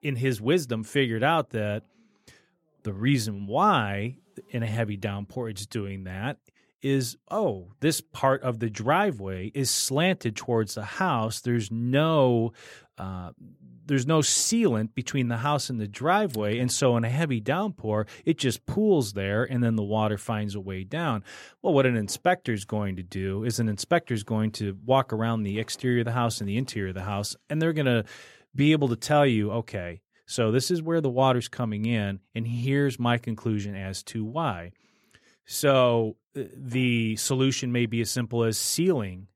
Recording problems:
none

